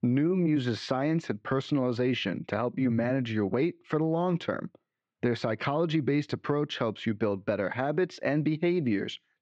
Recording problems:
muffled; slightly; fading above 3 kHz

